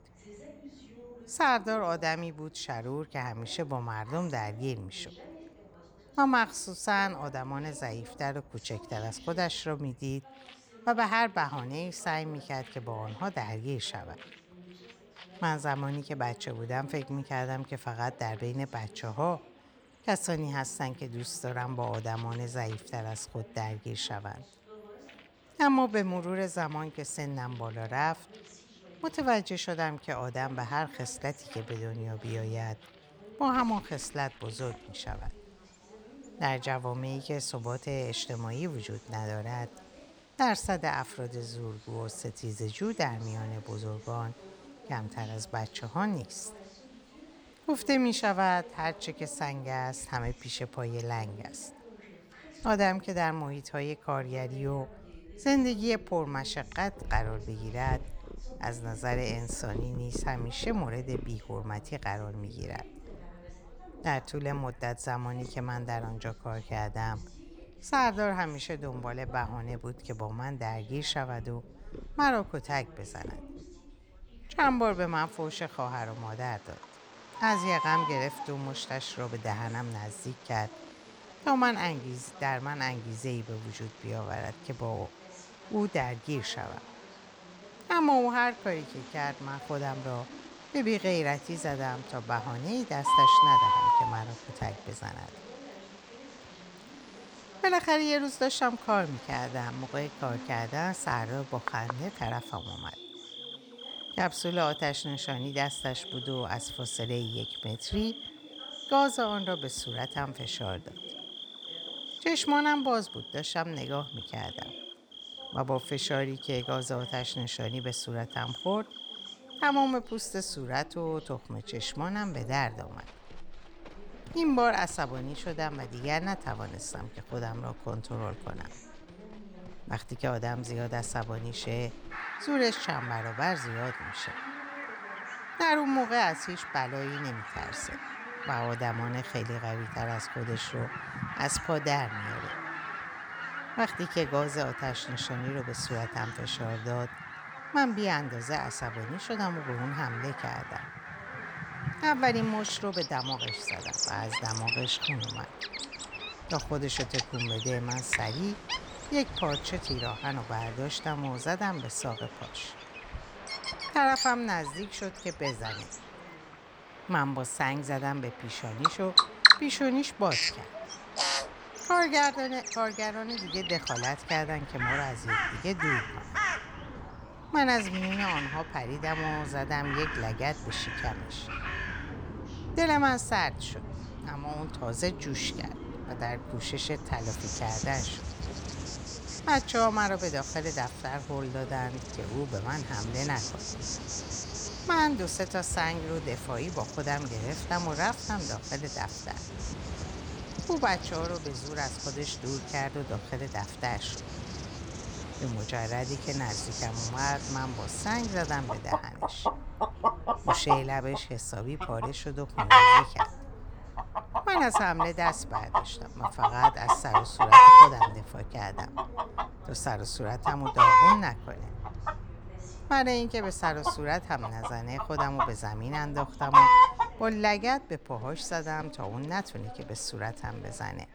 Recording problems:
animal sounds; very loud; throughout; 4 dB above the speech
background chatter; faint; throughout; 3 voices, 20 dB below the speech

